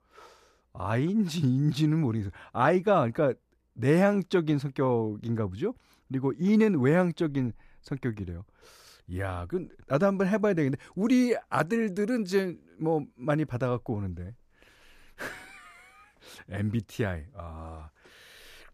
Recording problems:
none

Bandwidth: 14.5 kHz